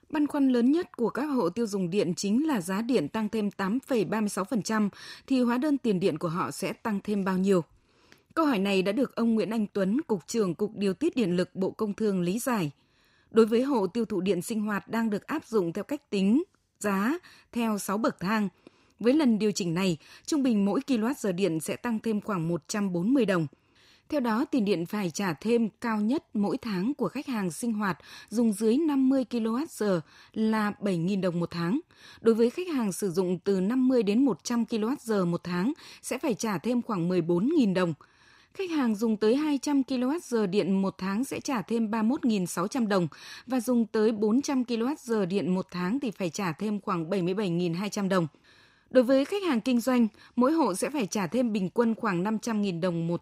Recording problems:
none

